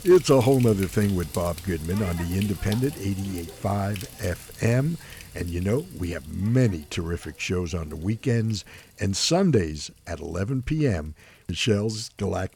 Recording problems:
household noises; noticeable; throughout; 15 dB below the speech

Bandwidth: 18 kHz